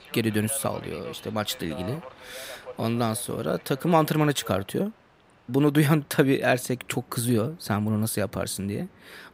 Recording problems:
train or aircraft noise; noticeable; throughout; 20 dB below the speech

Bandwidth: 15.5 kHz